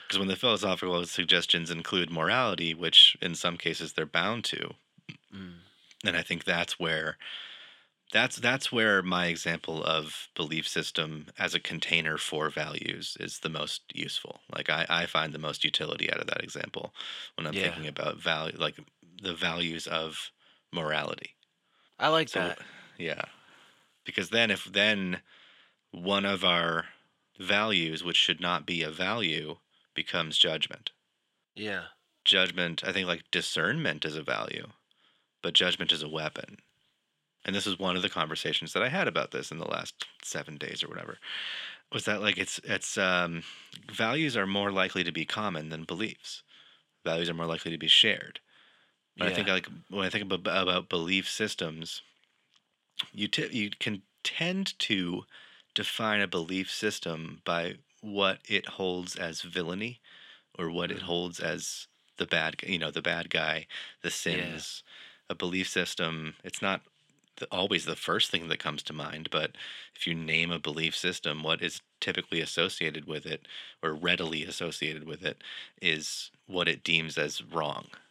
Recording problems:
thin; somewhat; fading below 1 kHz

